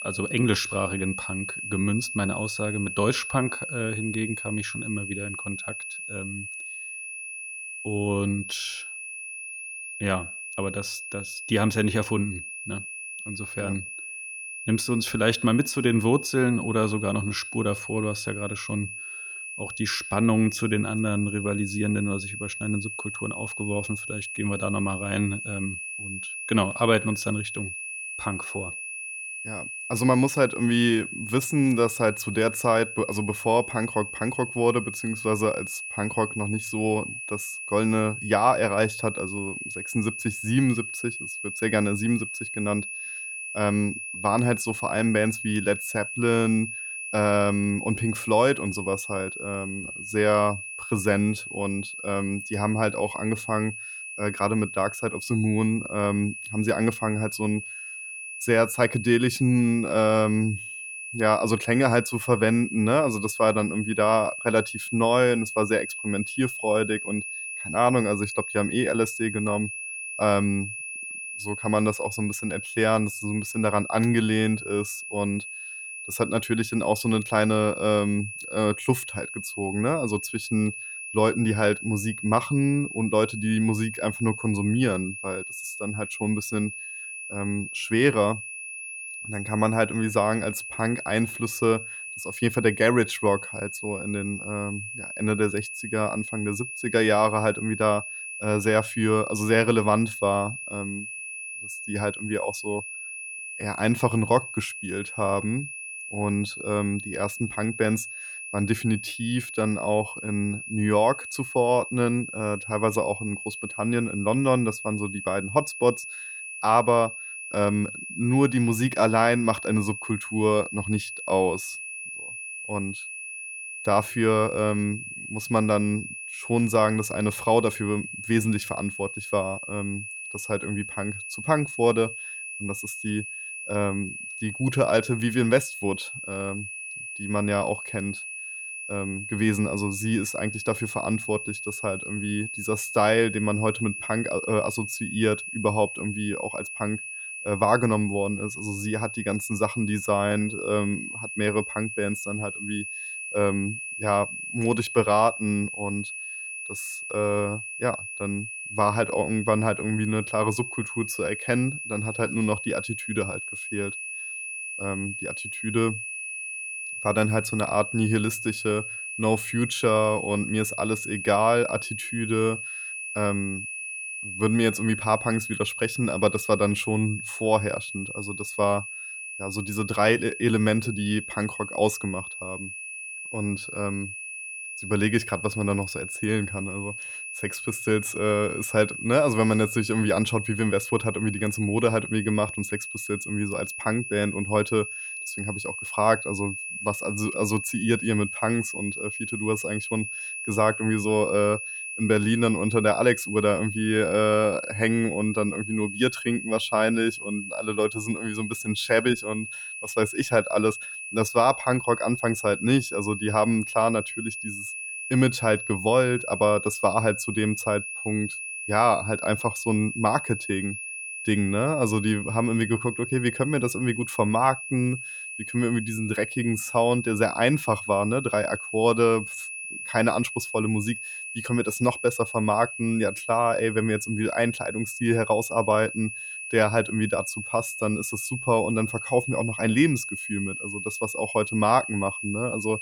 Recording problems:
high-pitched whine; loud; throughout; 2.5 kHz, 7 dB below the speech

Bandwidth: 19 kHz